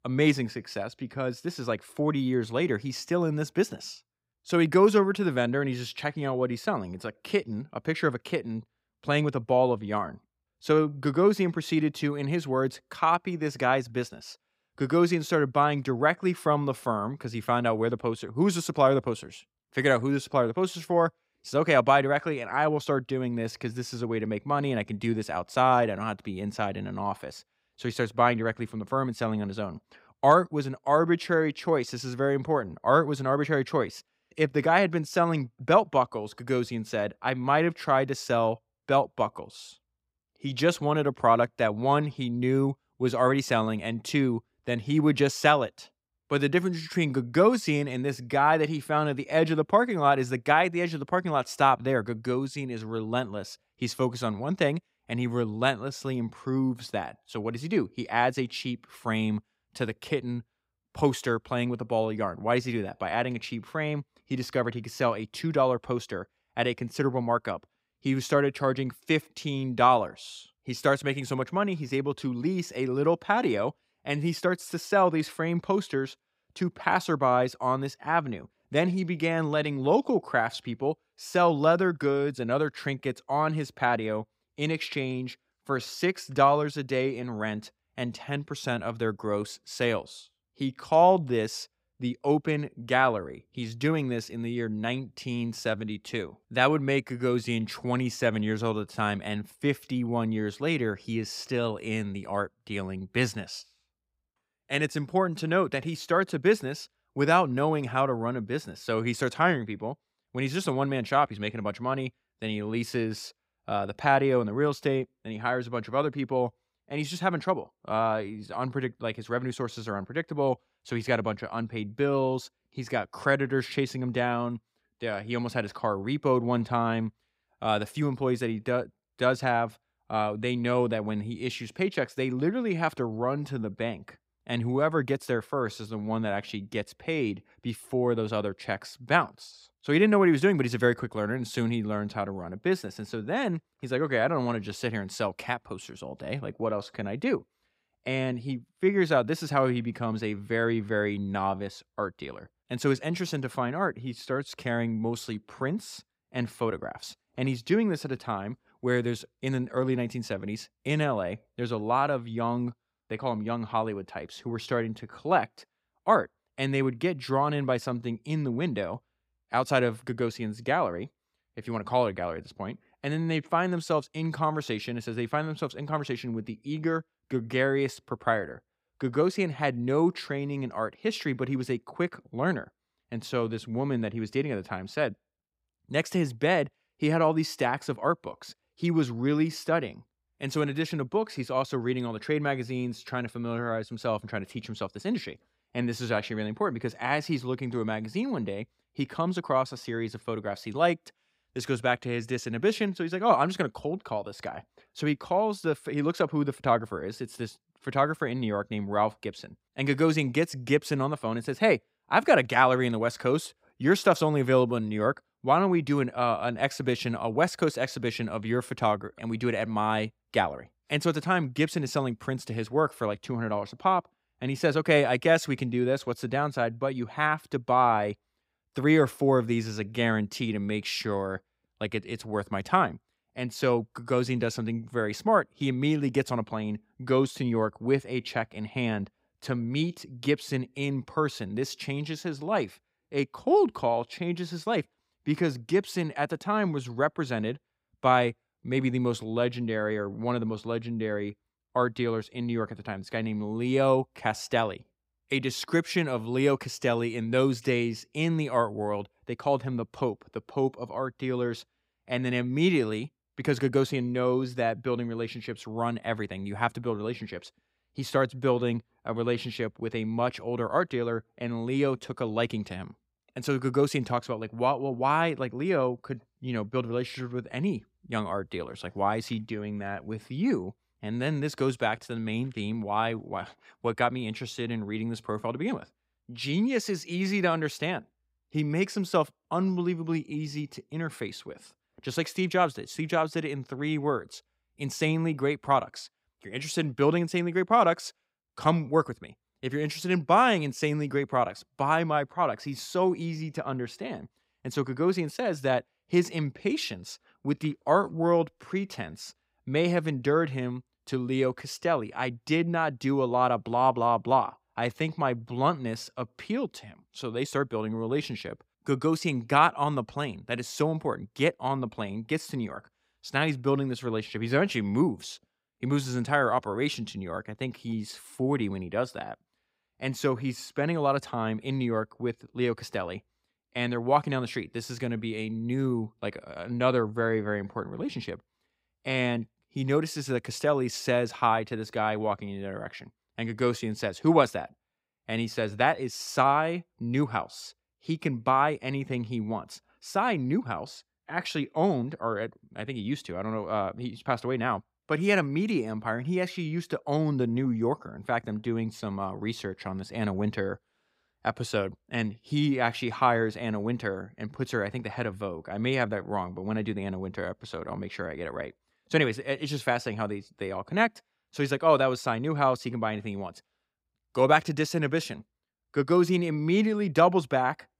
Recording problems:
none

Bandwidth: 15.5 kHz